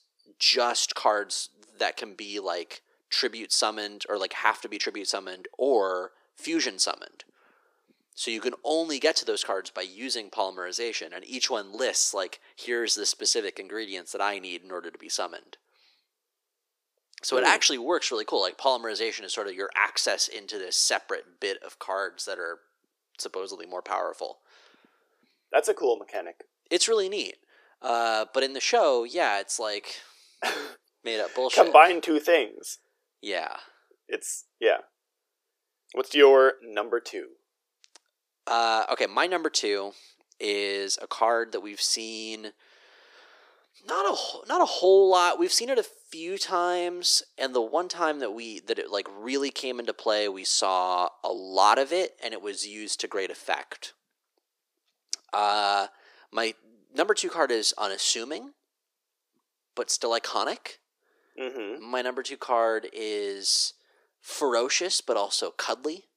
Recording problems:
thin; very; fading below 350 Hz

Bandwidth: 15 kHz